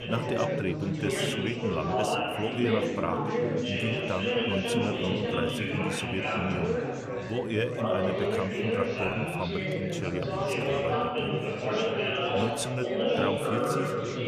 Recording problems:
chatter from many people; very loud; throughout; 4 dB above the speech

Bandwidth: 14.5 kHz